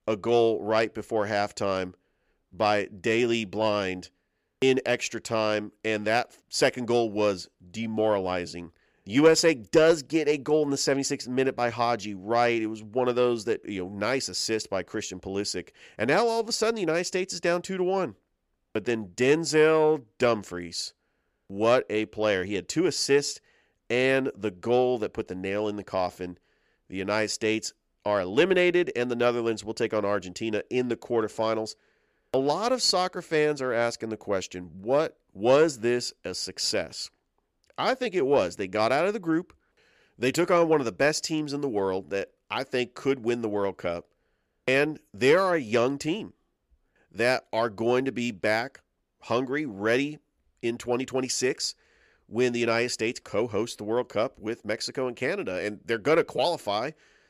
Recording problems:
none

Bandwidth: 14.5 kHz